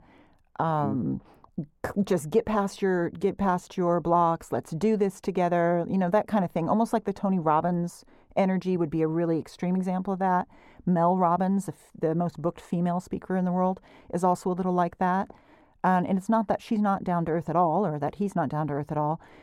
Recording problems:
muffled; very; fading above 1.5 kHz

